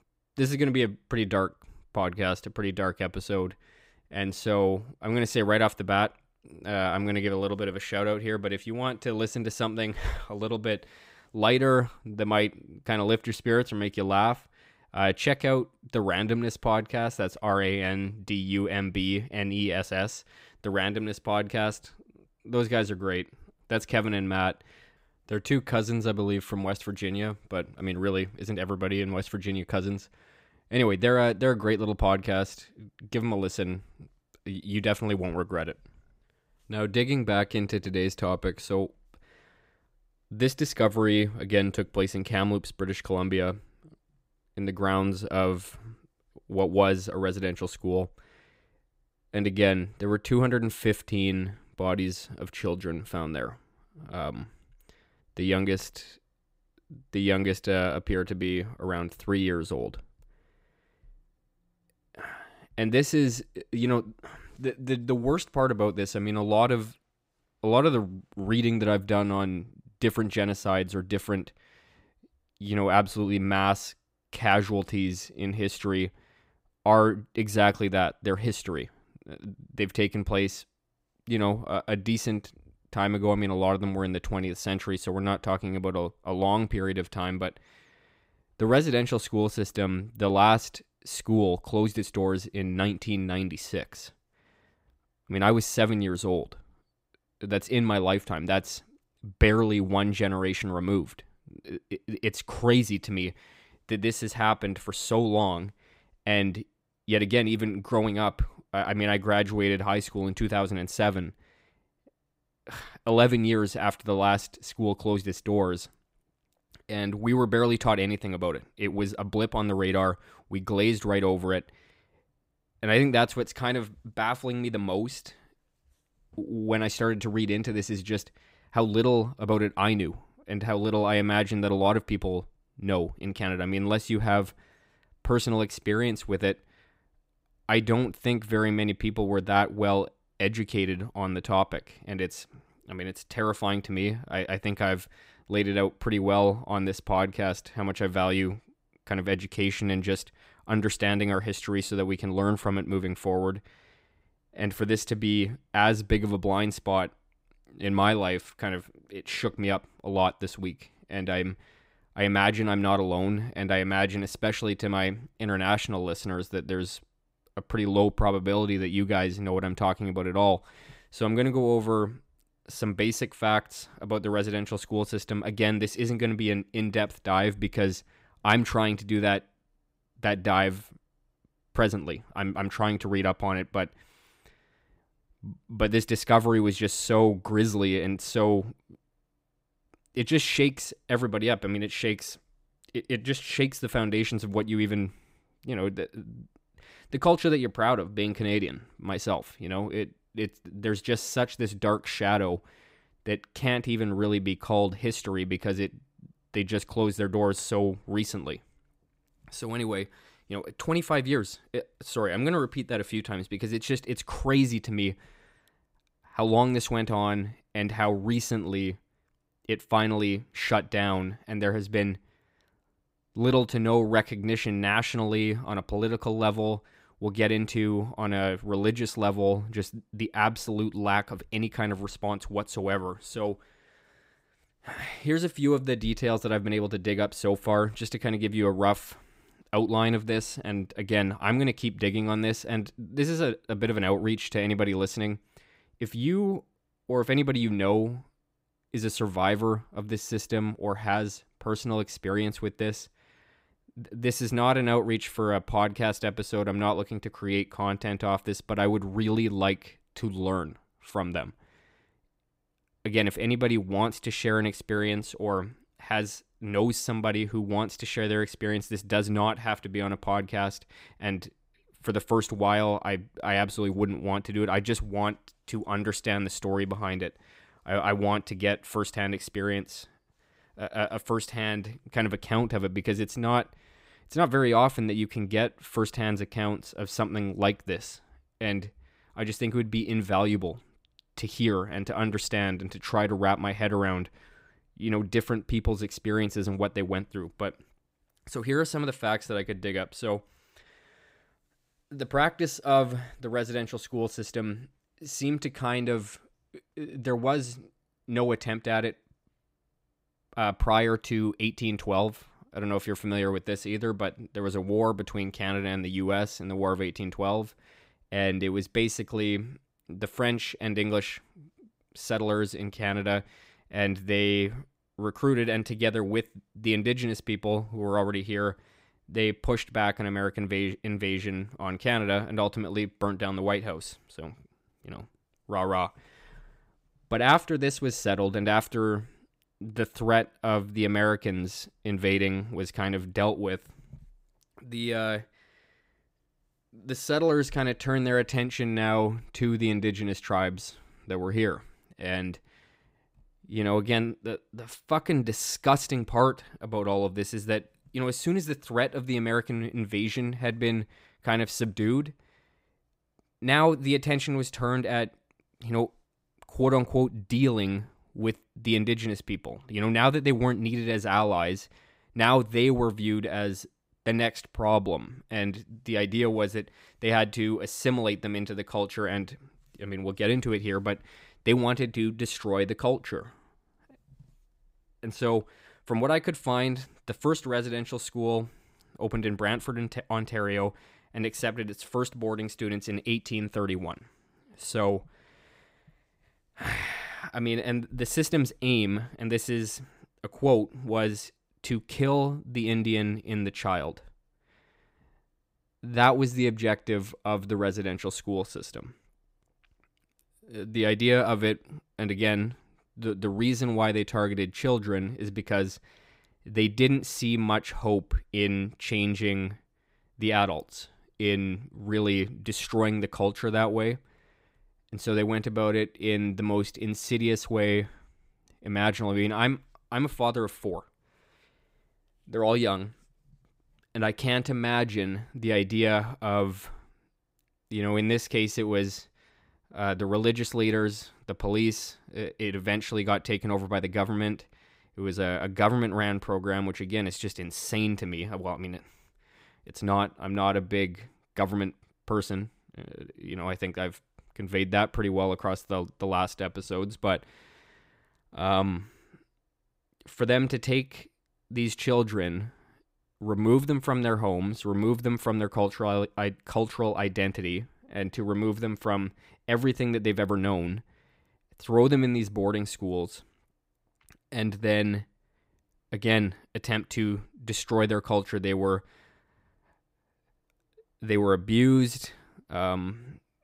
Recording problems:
none

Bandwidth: 15.5 kHz